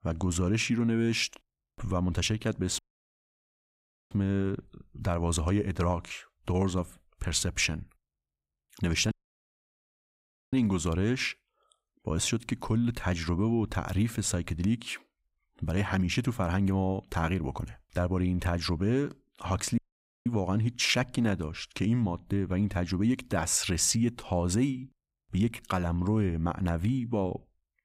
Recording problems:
audio cutting out; at 3 s for 1.5 s, at 9 s for 1.5 s and at 20 s

